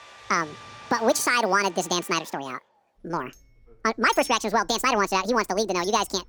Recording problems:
wrong speed and pitch; too fast and too high; 1.7 times normal speed
household noises; noticeable; throughout; 20 dB below the speech

